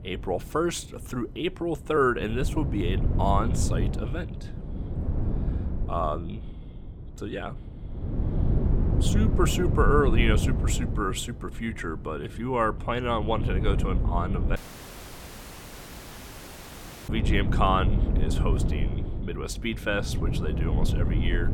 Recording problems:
wind noise on the microphone; heavy; 9 dB below the speech
audio cutting out; at 15 s for 2.5 s

